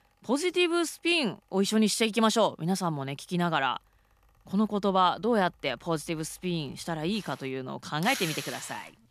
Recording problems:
machinery noise; noticeable; throughout; 10 dB below the speech

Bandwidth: 14.5 kHz